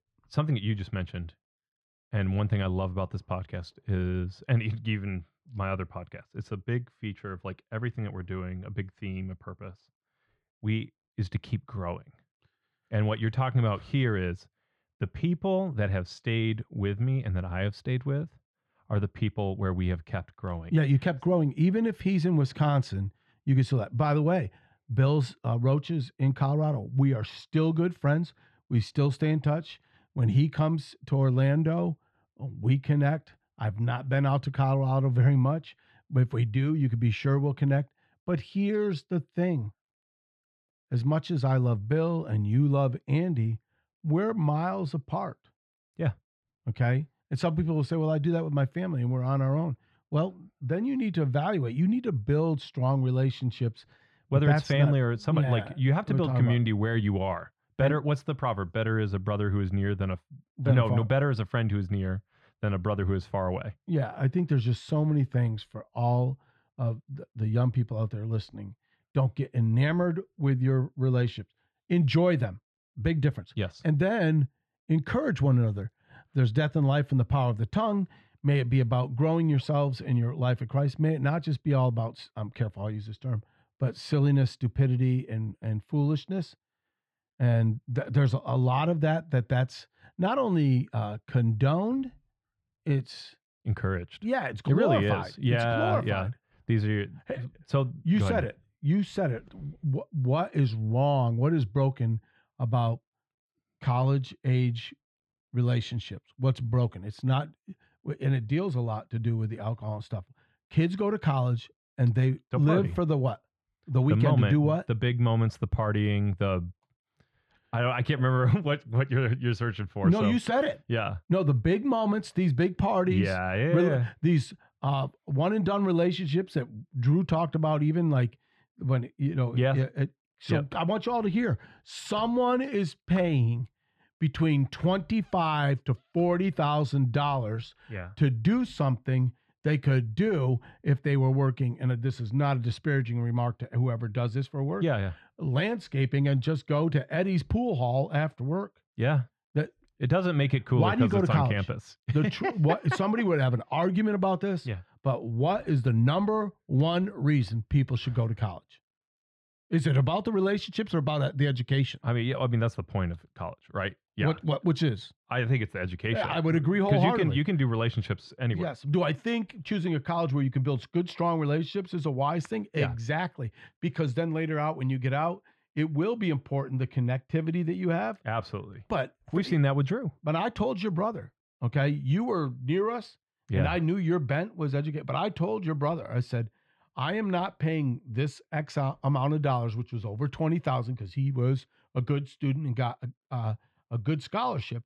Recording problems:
muffled; slightly; fading above 3 kHz

